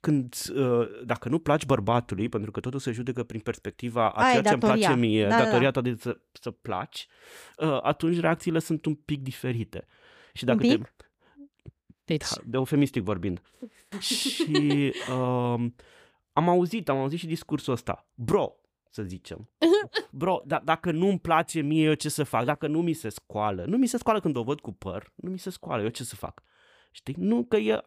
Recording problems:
none

